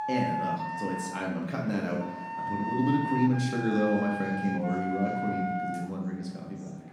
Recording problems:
off-mic speech; far
room echo; noticeable; dies away in 0.8 s
background music; loud; throughout; 4 dB below the speech
murmuring crowd; faint; throughout; 20 dB below the speech

